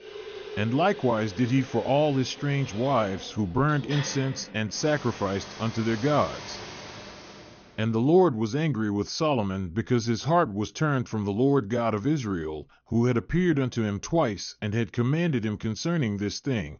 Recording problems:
high frequencies cut off; noticeable; nothing above 6.5 kHz
household noises; noticeable; until 7 s; 15 dB below the speech

